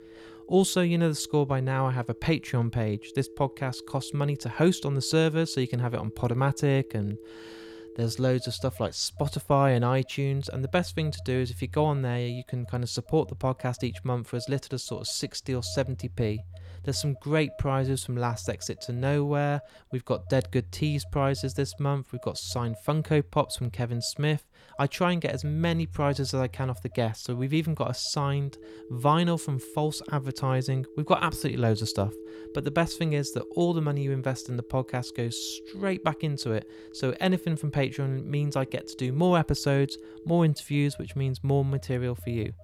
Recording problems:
alarms or sirens; noticeable; throughout; 15 dB below the speech

